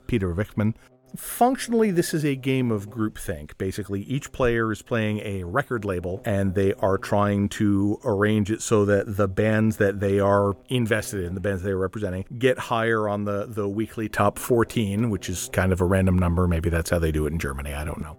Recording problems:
electrical hum; faint; throughout; 60 Hz, 30 dB below the speech

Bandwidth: 17.5 kHz